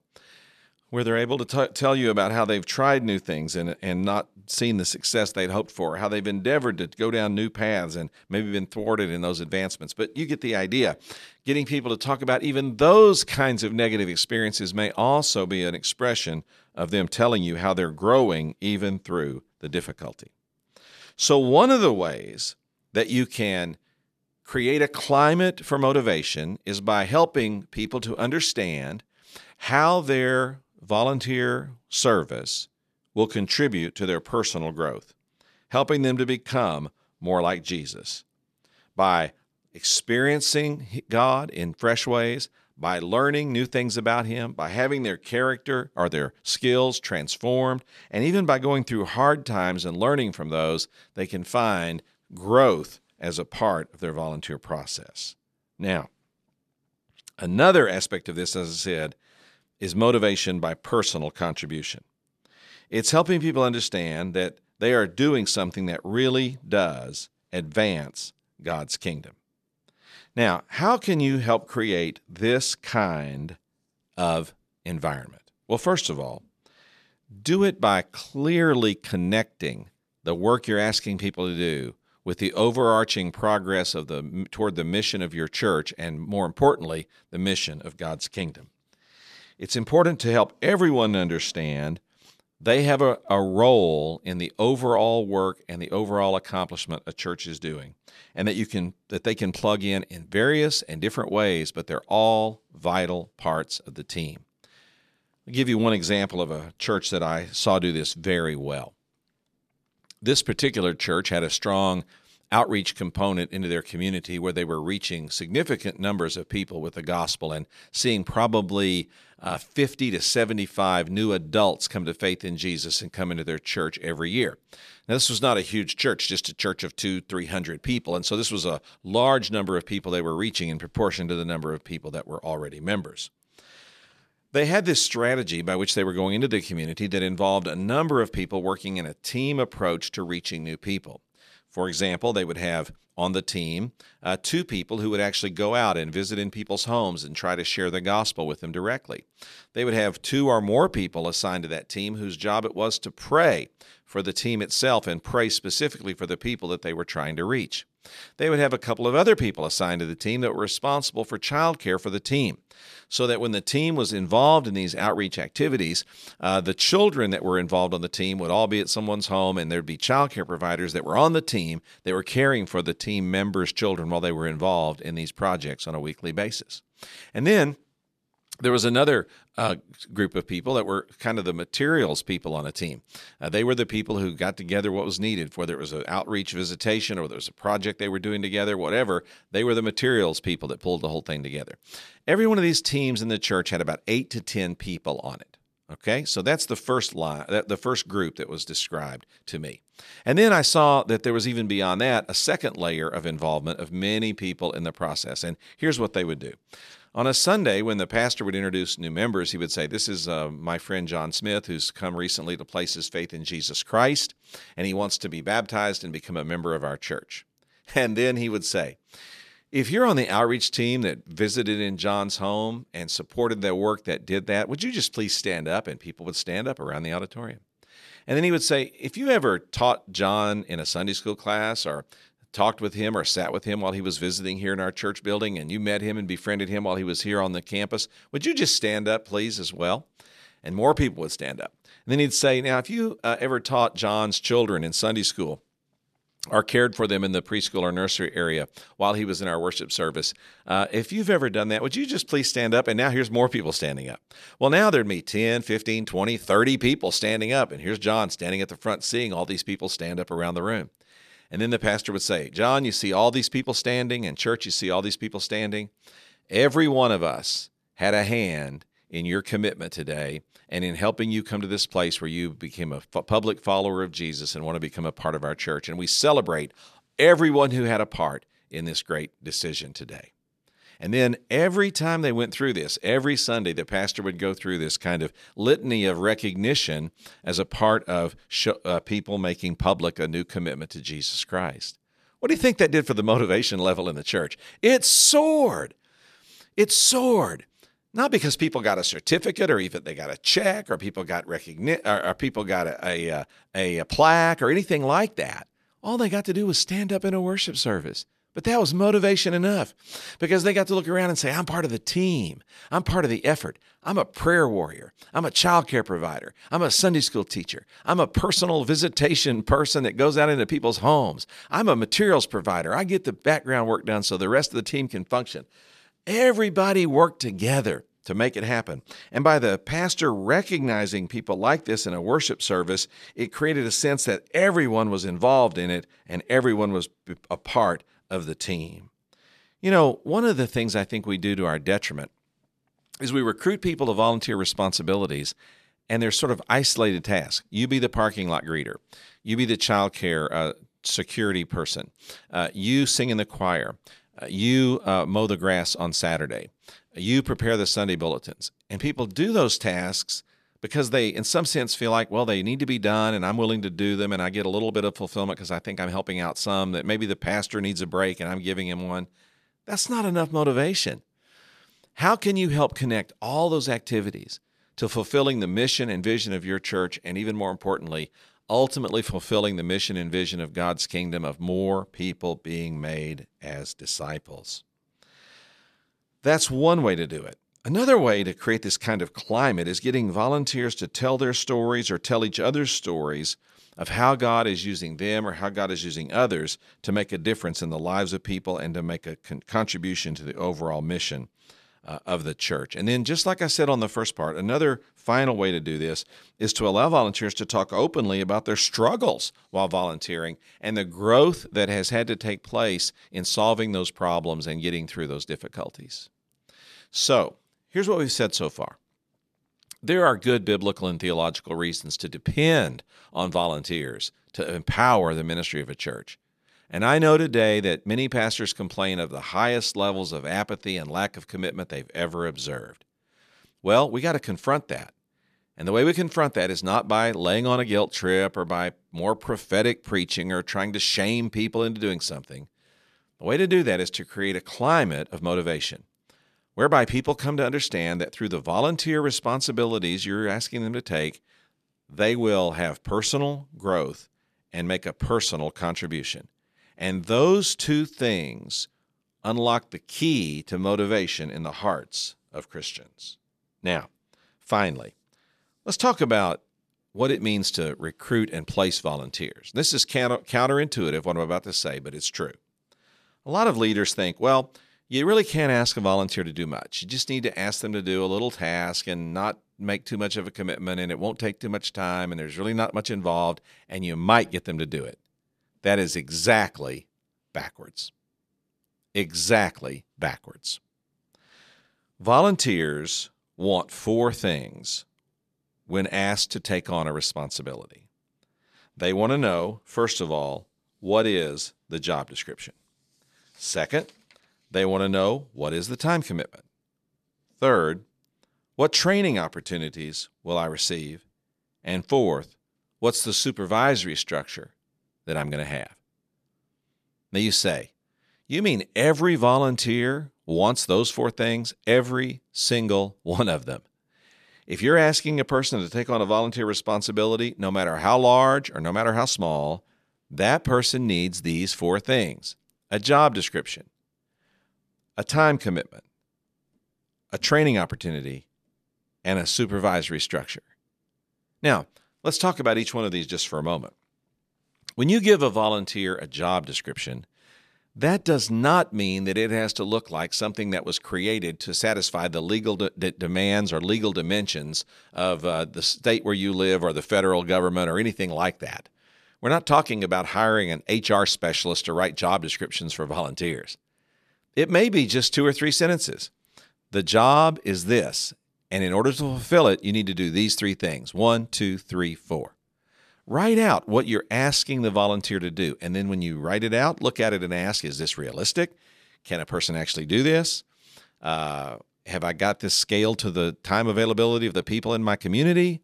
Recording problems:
none

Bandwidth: 14.5 kHz